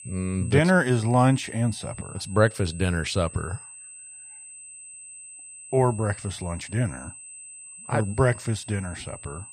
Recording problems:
high-pitched whine; noticeable; throughout; 8 kHz, 15 dB below the speech

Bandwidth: 14.5 kHz